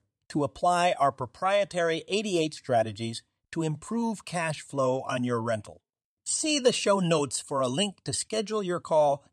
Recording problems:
none

